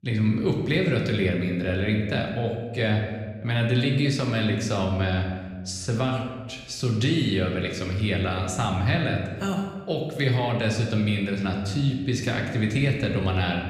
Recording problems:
room echo; noticeable; dies away in 1.1 s
off-mic speech; somewhat distant

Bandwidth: 15 kHz